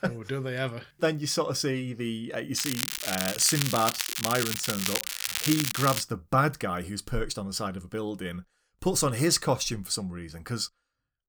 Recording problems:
crackling; loud; from 2.5 to 6 s; 1 dB below the speech

